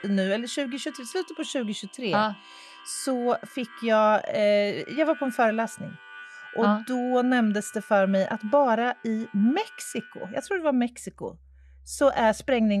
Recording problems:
muffled; slightly; fading above 1.5 kHz
background music; faint; throughout; 20 dB below the speech
abrupt cut into speech; at the end

